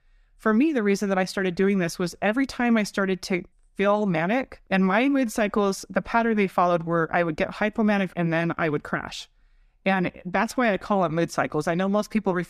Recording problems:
none

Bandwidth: 14.5 kHz